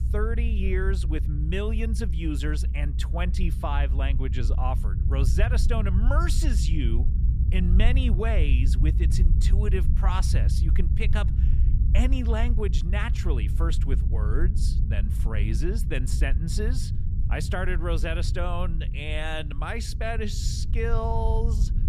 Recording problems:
low rumble; loud; throughout; 9 dB below the speech

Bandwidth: 14.5 kHz